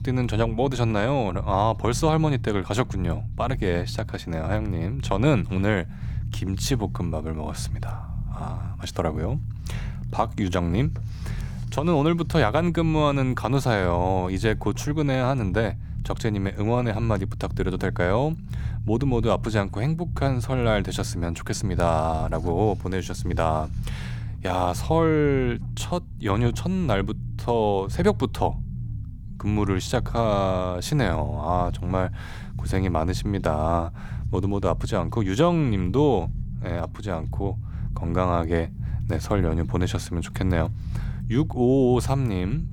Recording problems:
low rumble; noticeable; throughout; 20 dB below the speech

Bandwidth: 17.5 kHz